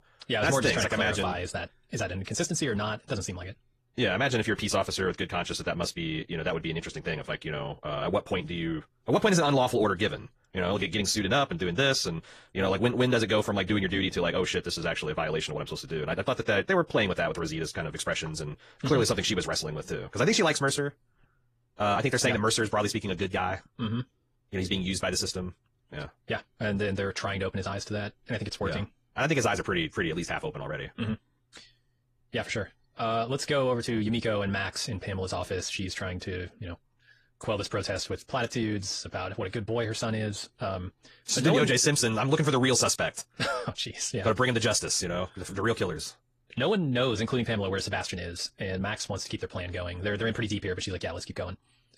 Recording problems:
wrong speed, natural pitch; too fast; 1.5 times normal speed
garbled, watery; slightly; nothing above 15 kHz

